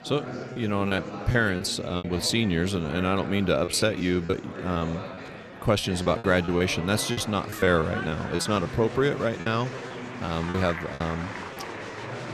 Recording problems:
murmuring crowd; noticeable; throughout; 10 dB below the speech
choppy; very; 10% of the speech affected

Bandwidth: 13.5 kHz